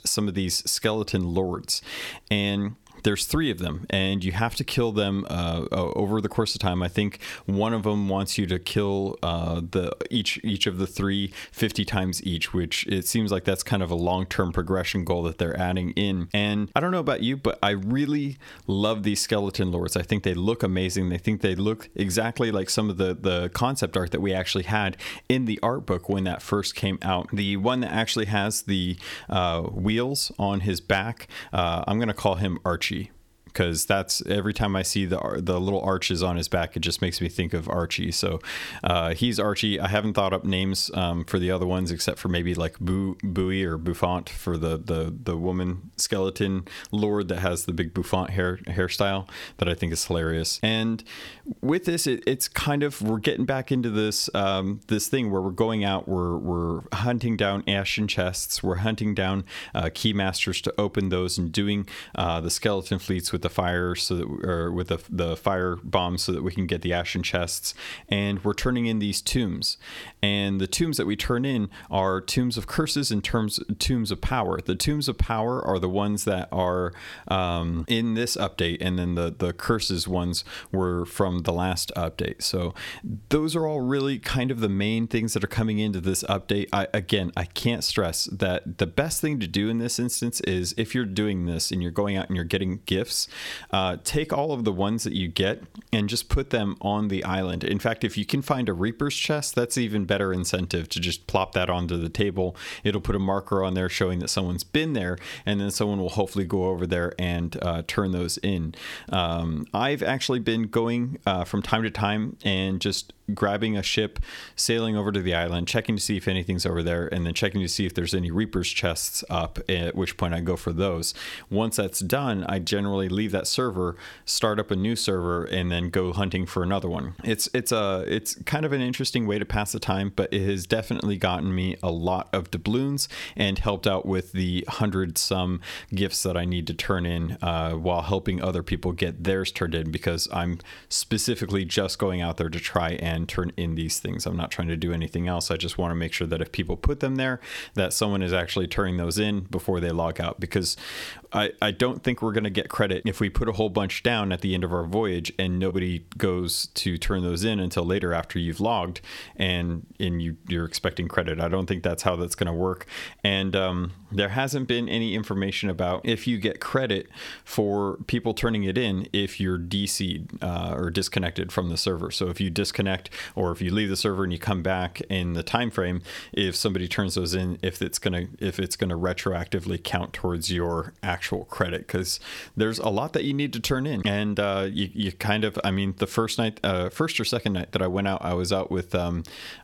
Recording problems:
squashed, flat; somewhat

